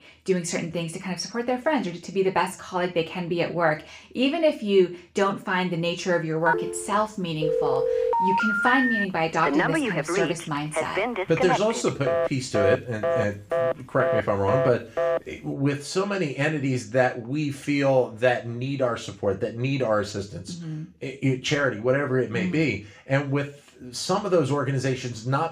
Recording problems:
room echo; slight; dies away in 0.3 s
off-mic speech; somewhat distant
phone ringing; loud; from 6.5 to 15 s; peak 3 dB above the speech

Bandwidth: 15 kHz